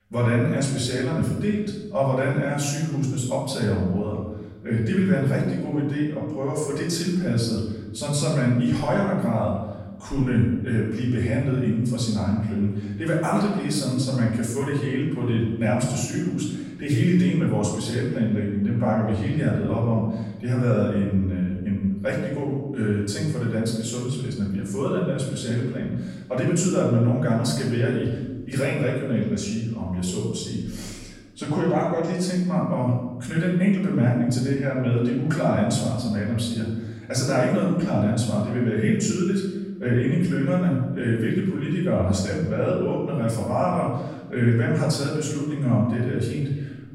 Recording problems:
off-mic speech; far
room echo; noticeable; dies away in 1 s

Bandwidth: 16 kHz